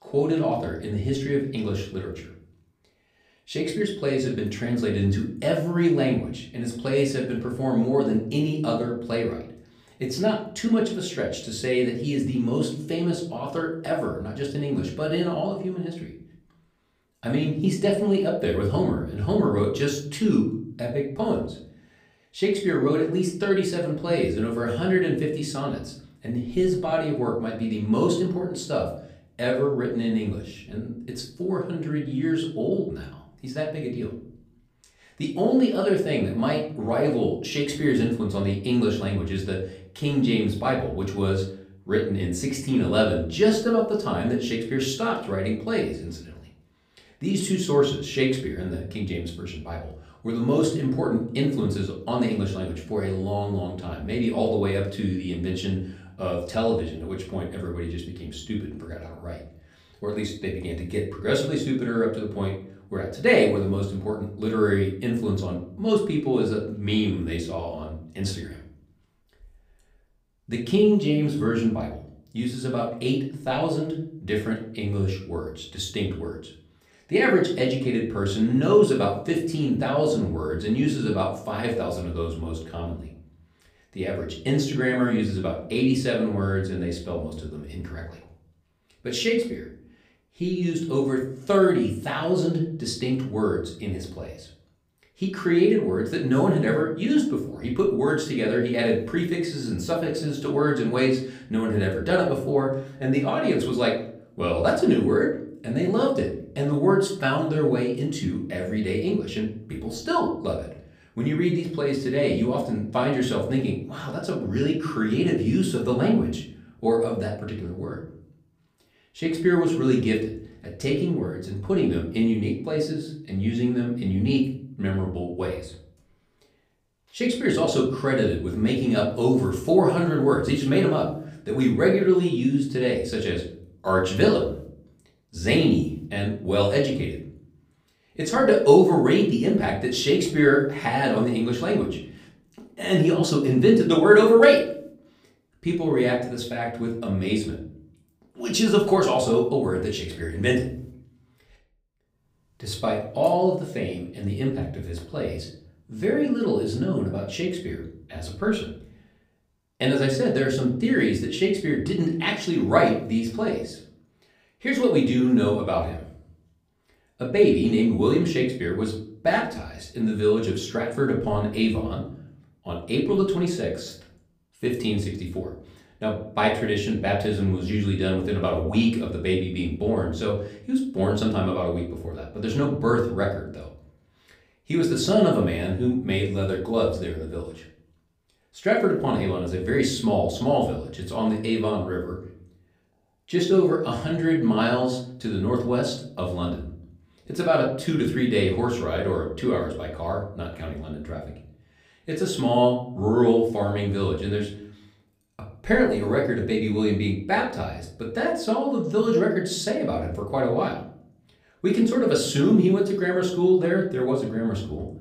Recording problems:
off-mic speech; far
room echo; slight; dies away in 0.5 s

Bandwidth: 15.5 kHz